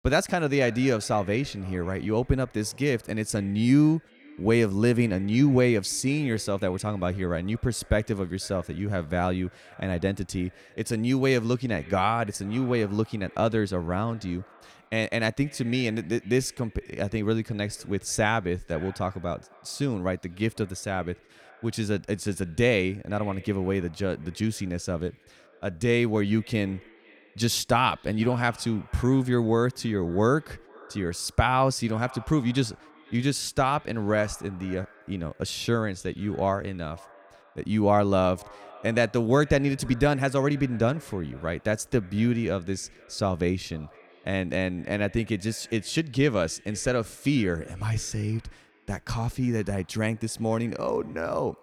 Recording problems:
echo of what is said; faint; throughout; 490 ms later, 25 dB below the speech

